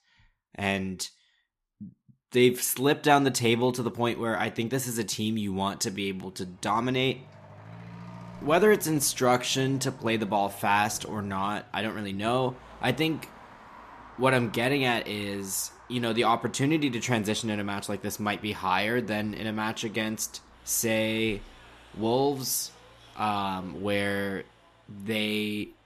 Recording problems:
traffic noise; faint; from 5.5 s on; 20 dB below the speech

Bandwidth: 14 kHz